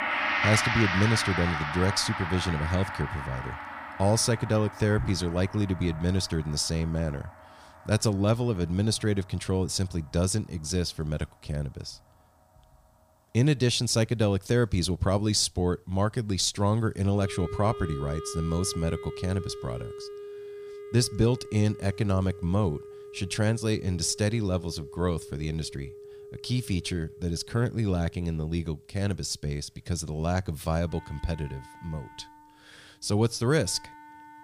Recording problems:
background music; loud; throughout; 7 dB below the speech

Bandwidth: 15 kHz